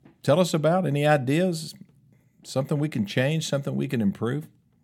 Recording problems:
none

